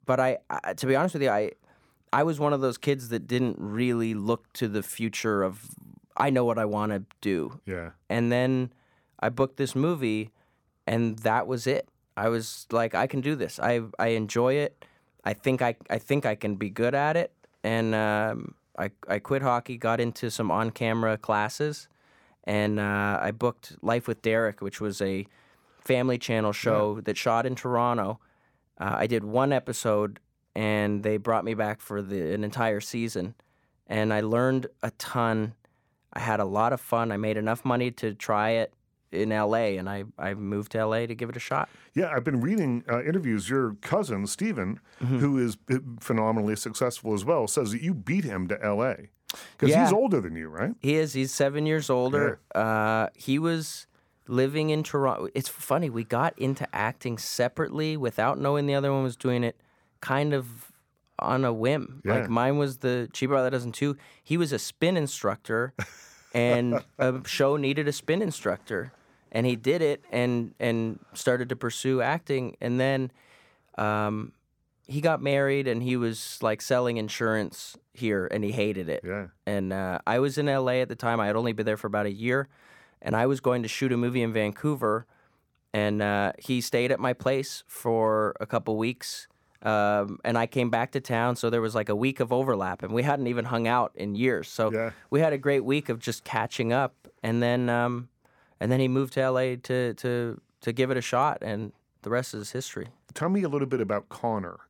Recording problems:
none

